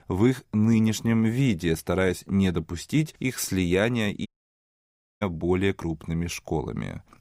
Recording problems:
audio cutting out; at 4.5 s for 1 s

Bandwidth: 15.5 kHz